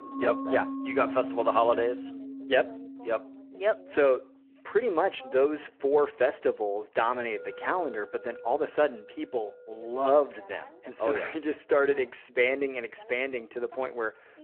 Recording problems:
phone-call audio
background music; noticeable; throughout; 10 dB below the speech
voice in the background; faint; throughout; 25 dB below the speech

